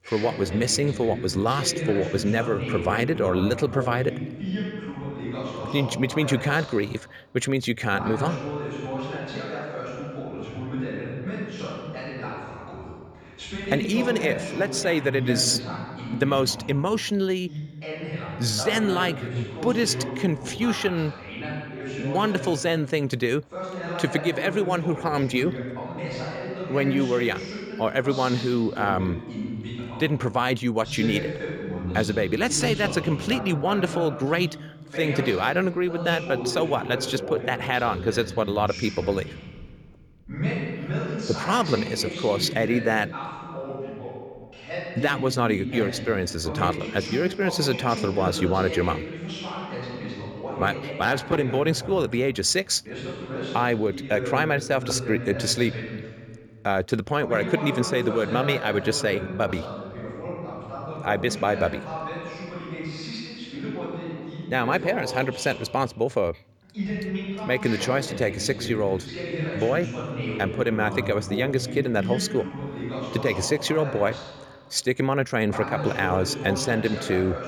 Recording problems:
voice in the background; loud; throughout; 8 dB below the speech

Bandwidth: 18.5 kHz